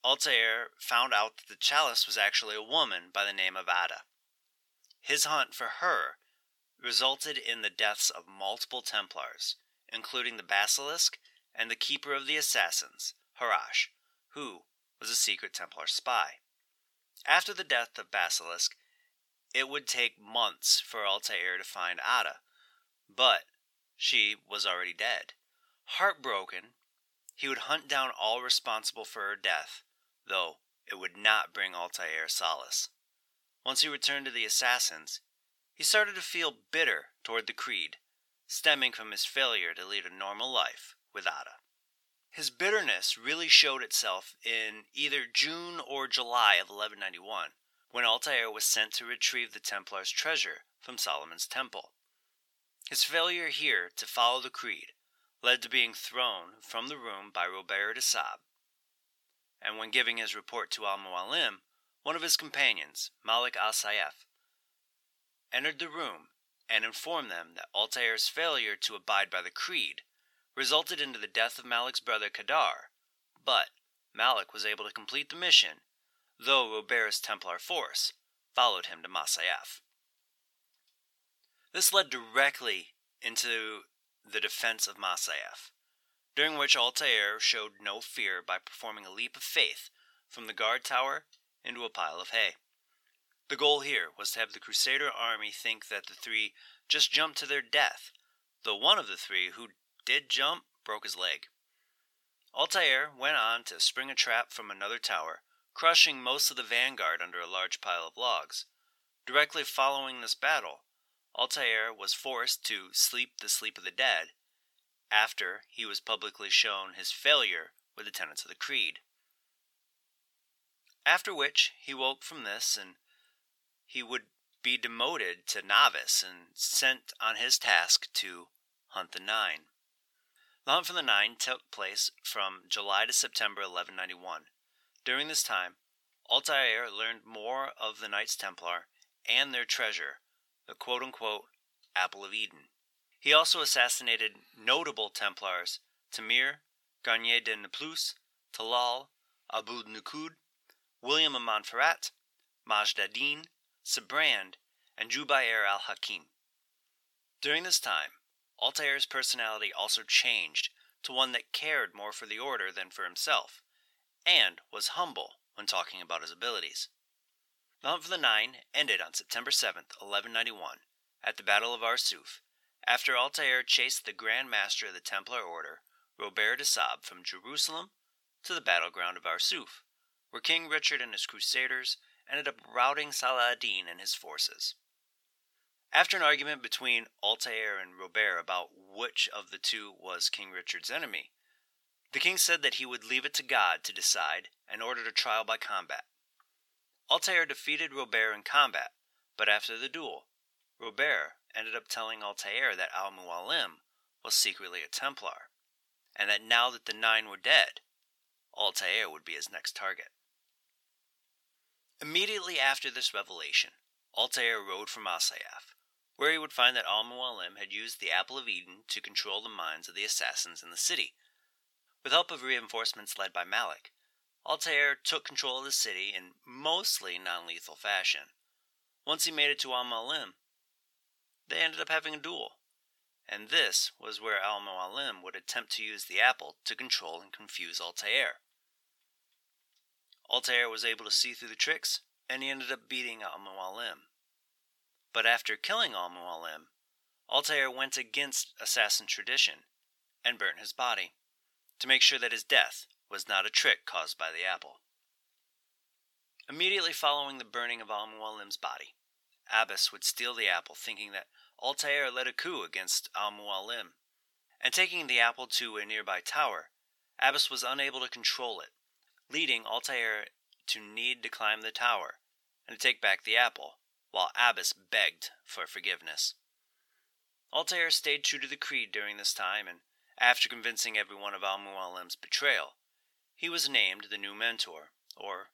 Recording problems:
thin; very; fading below 850 Hz

